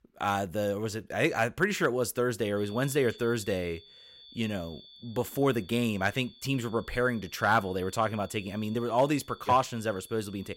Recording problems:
high-pitched whine; faint; from 2.5 s on; 3.5 kHz, 20 dB below the speech

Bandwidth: 16 kHz